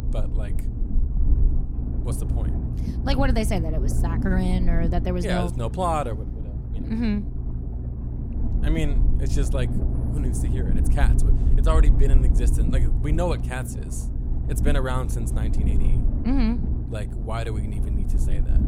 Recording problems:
low rumble; loud; throughout; 8 dB below the speech

